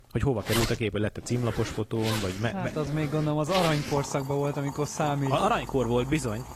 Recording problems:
garbled, watery; slightly
household noises; loud; throughout; 8 dB below the speech

